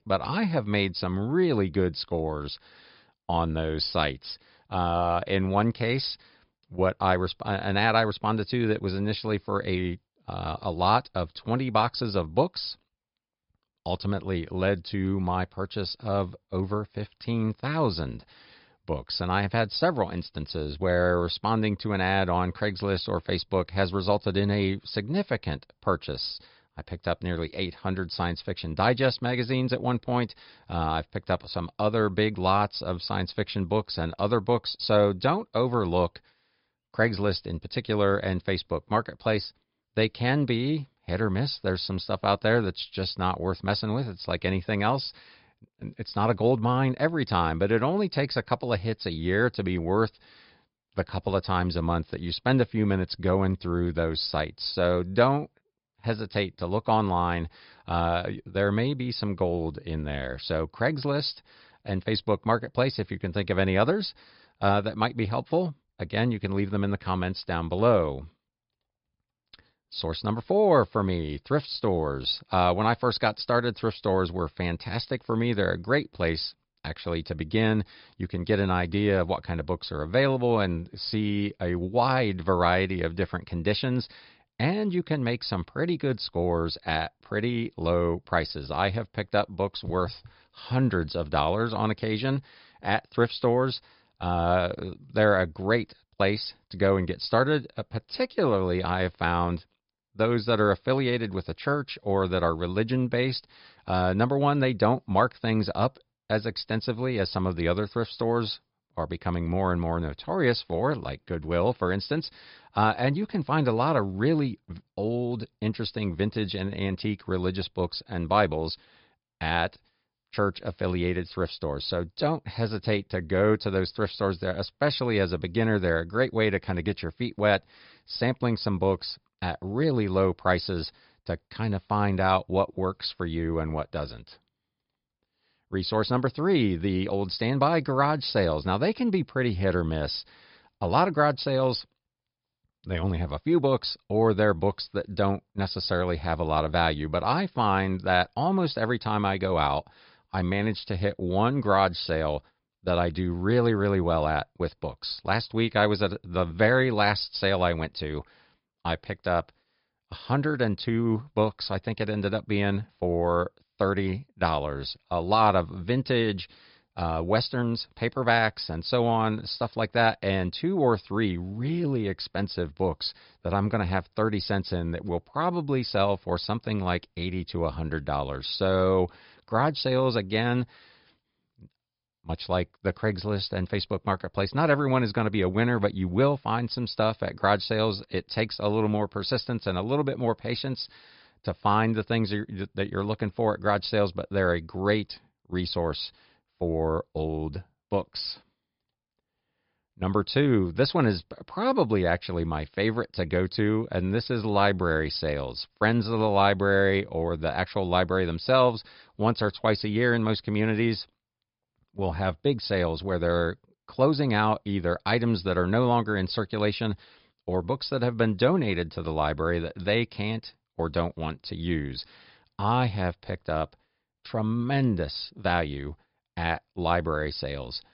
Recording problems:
high frequencies cut off; noticeable; nothing above 5.5 kHz

